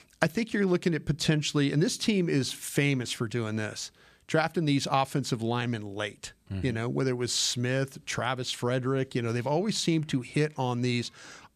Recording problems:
none

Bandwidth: 14.5 kHz